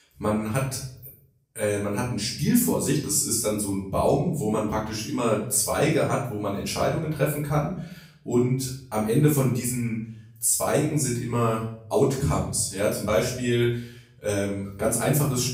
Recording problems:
off-mic speech; far
room echo; noticeable; dies away in 0.5 s

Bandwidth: 15.5 kHz